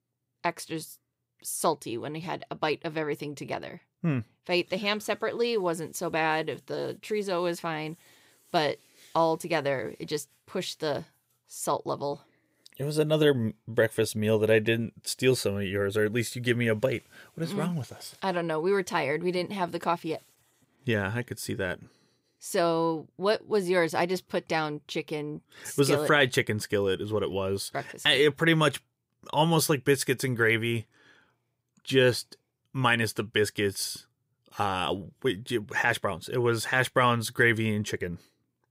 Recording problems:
none

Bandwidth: 15.5 kHz